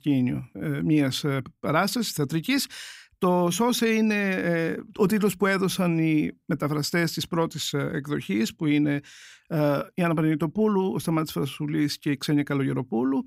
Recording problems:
none

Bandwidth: 15.5 kHz